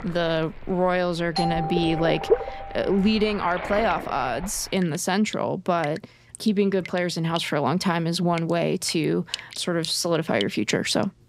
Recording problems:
rain or running water; noticeable; throughout; 10 dB below the speech
doorbell; noticeable; from 1.5 to 3 s; peak 3 dB below the speech

